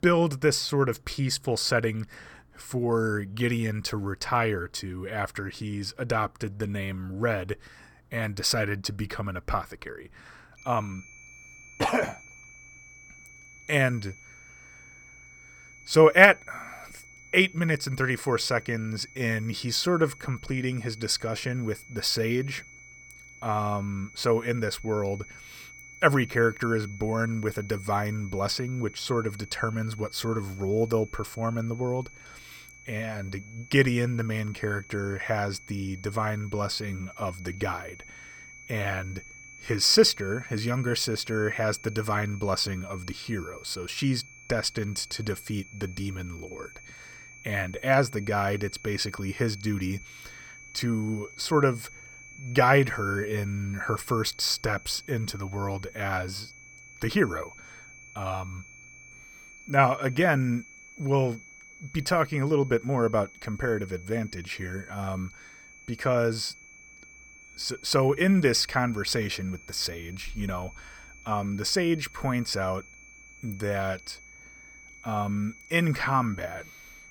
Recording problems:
high-pitched whine; noticeable; from 11 s on; 2.5 kHz, 20 dB below the speech

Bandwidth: 18.5 kHz